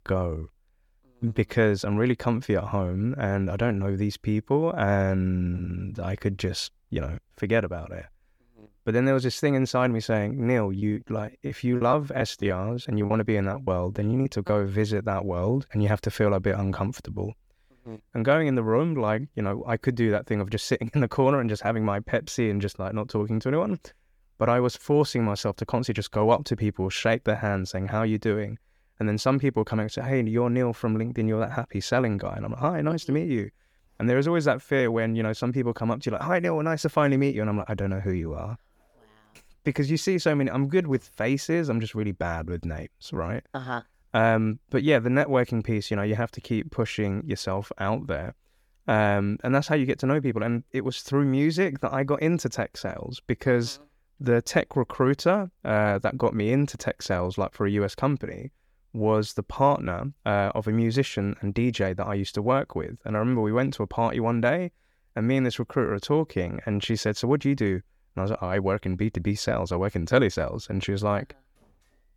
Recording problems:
choppy; very; from 11 to 14 s; 15% of the speech affected

